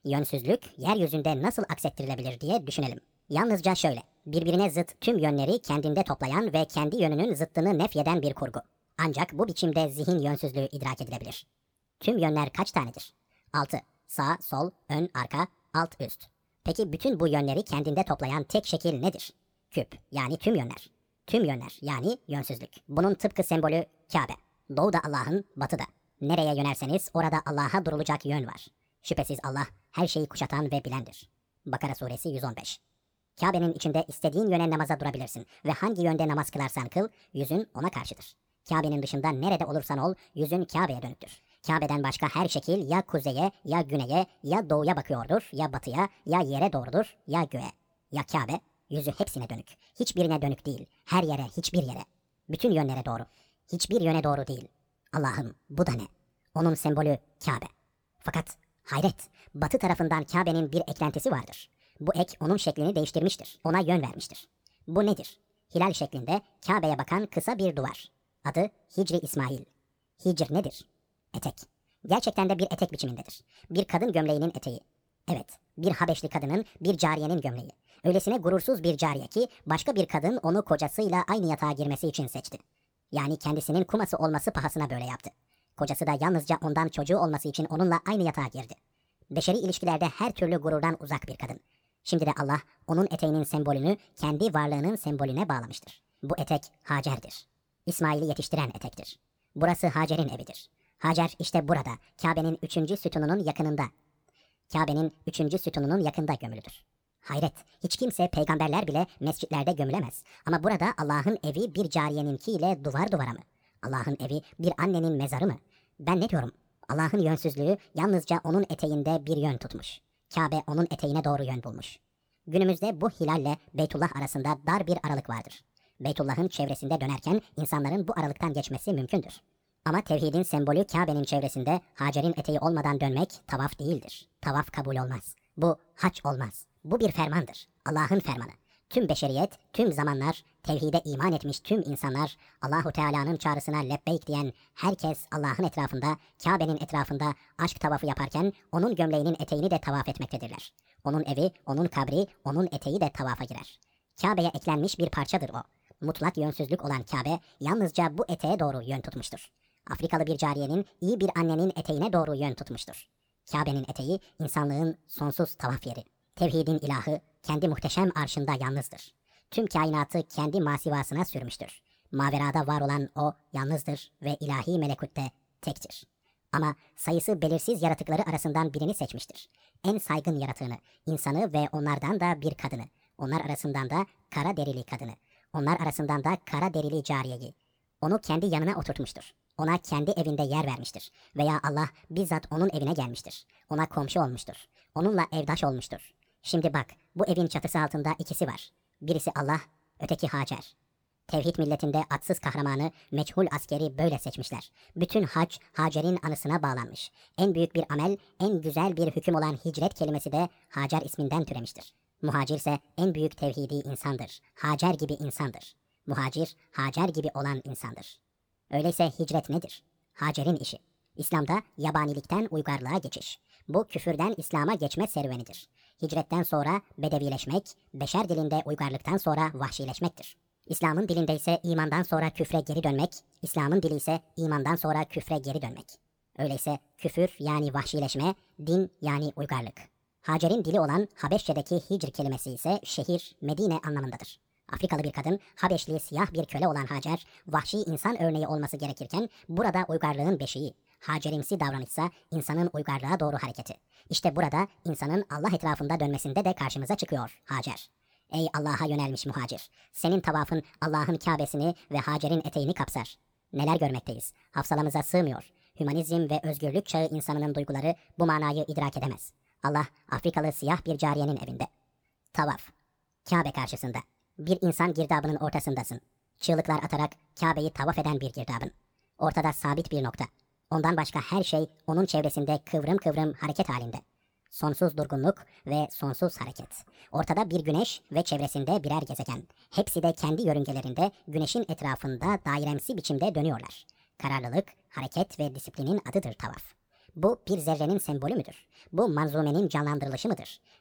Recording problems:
wrong speed and pitch; too fast and too high; 1.6 times normal speed

